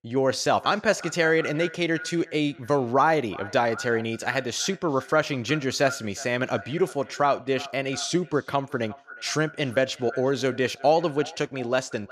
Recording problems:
echo of what is said; noticeable; throughout; 360 ms later, 15 dB below the speech

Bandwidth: 14.5 kHz